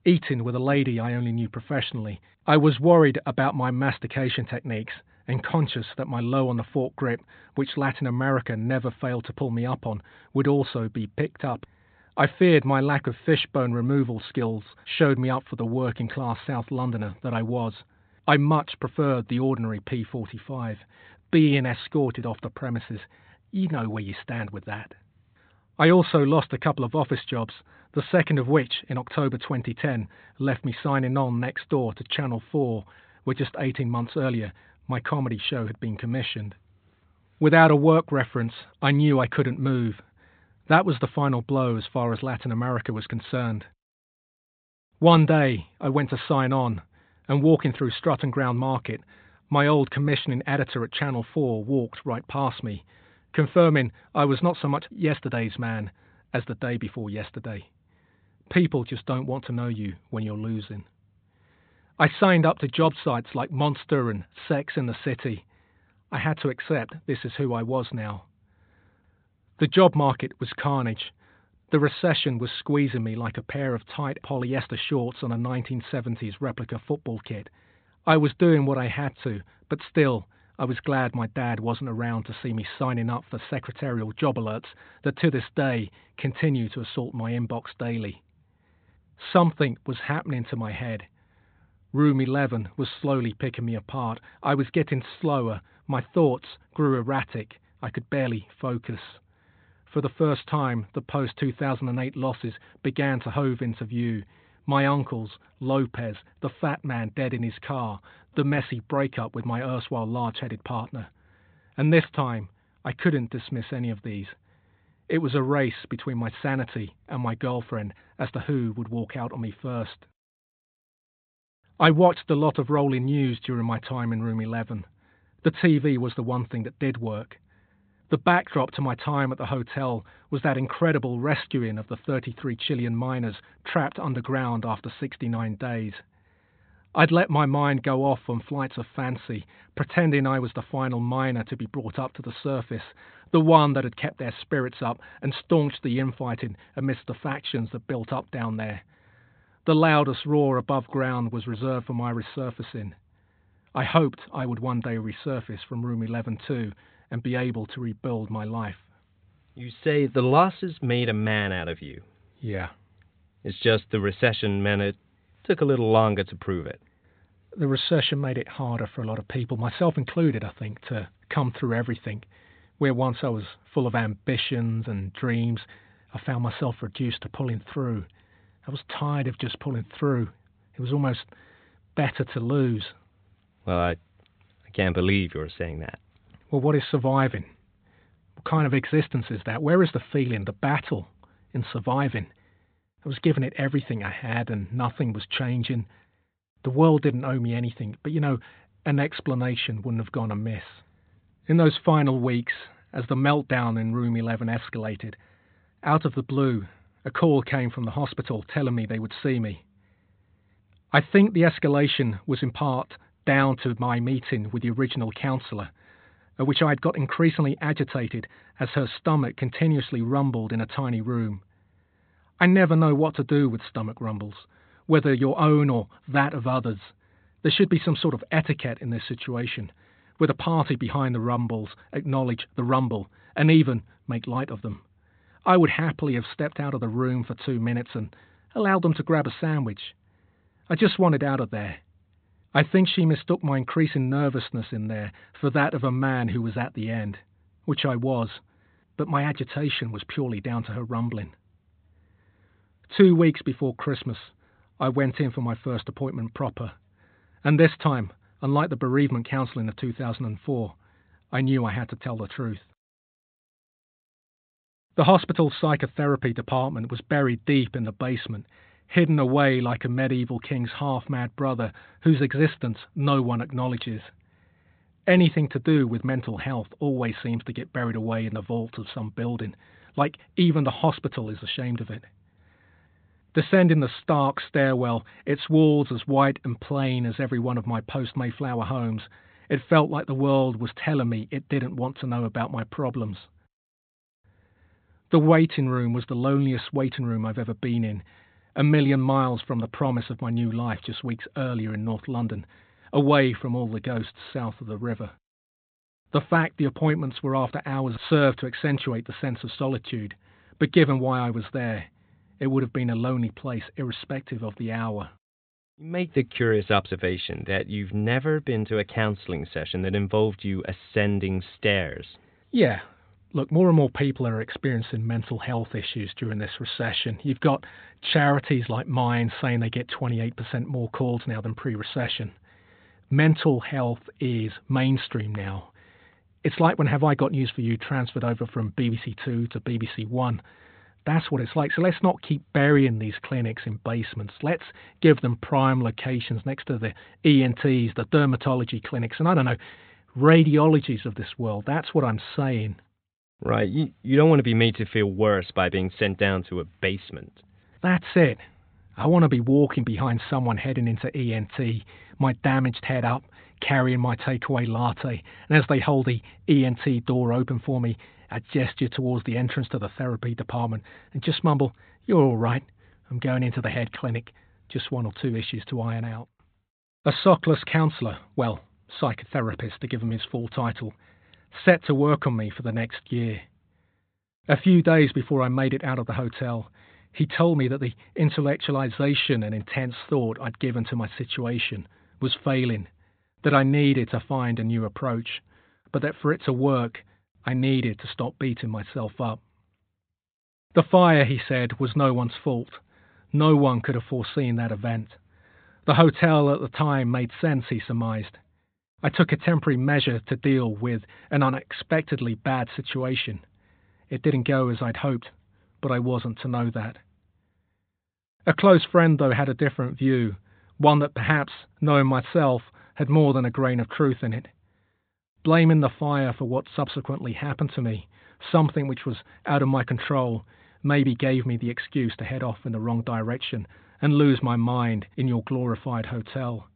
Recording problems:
high frequencies cut off; severe; nothing above 4 kHz

